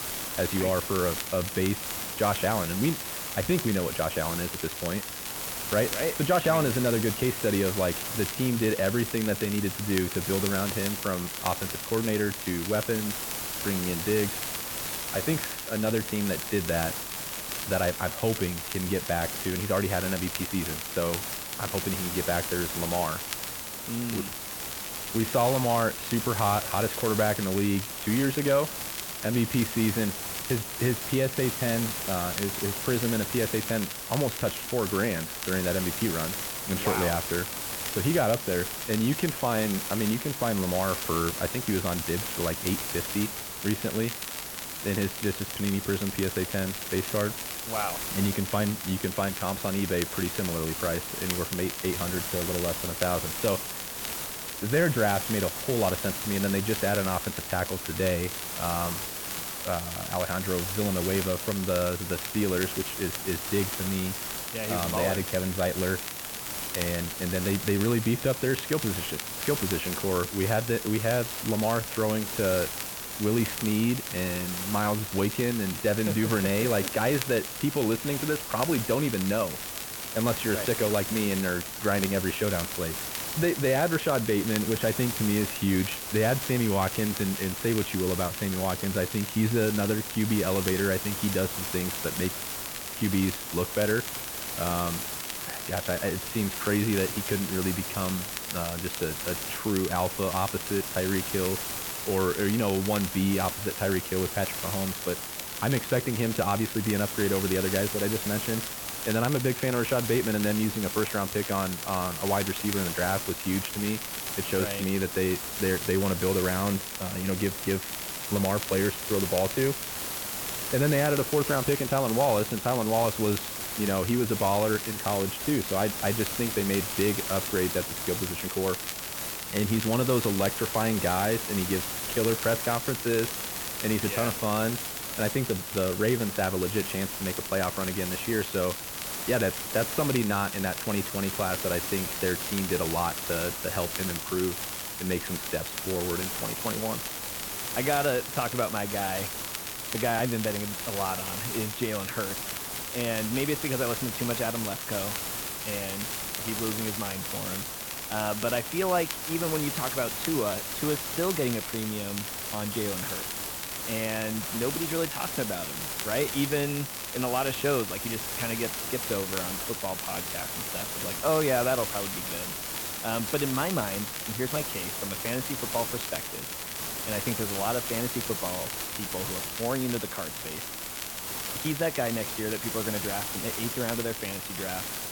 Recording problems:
muffled; very; fading above 3 kHz
hiss; loud; throughout; 4 dB below the speech
crackle, like an old record; noticeable; 10 dB below the speech

